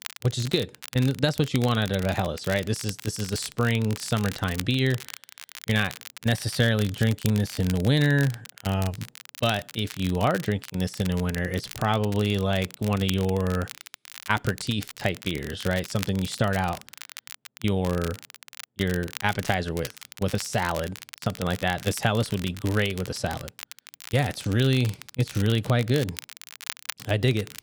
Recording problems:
crackle, like an old record; noticeable; 15 dB below the speech

